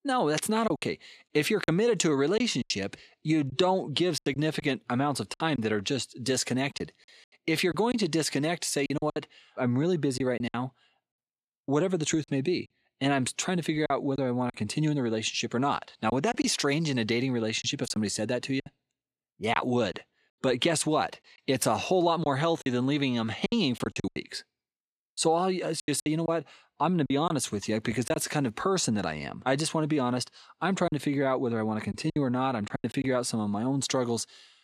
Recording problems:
choppy; very; 7% of the speech affected

